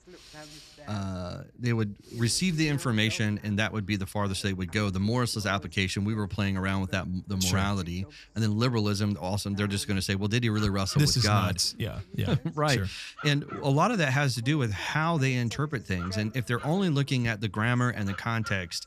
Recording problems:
voice in the background; faint; throughout; 20 dB below the speech

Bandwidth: 14.5 kHz